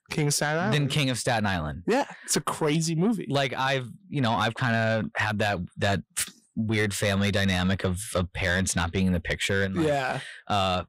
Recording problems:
distortion; slight; 10 dB below the speech

